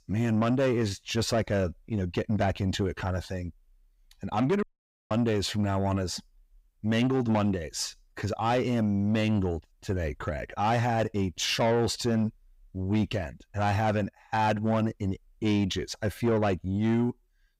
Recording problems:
distortion; slight; 10 dB below the speech
audio cutting out; at 4.5 s

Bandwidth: 15.5 kHz